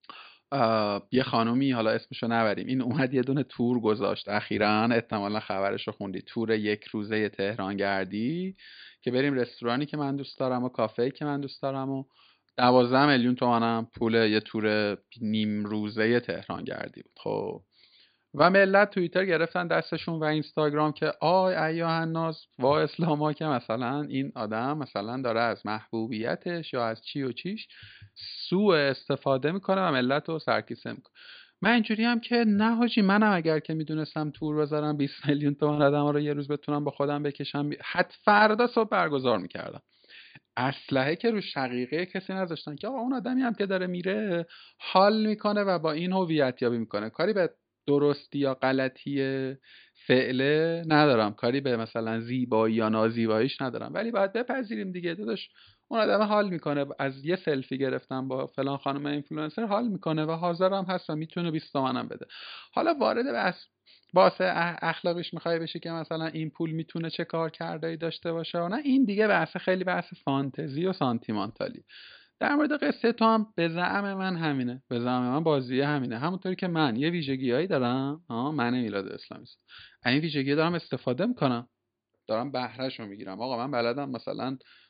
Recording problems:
high frequencies cut off; severe; nothing above 5 kHz

